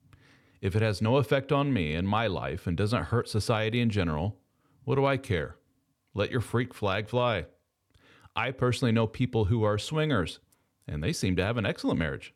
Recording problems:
none

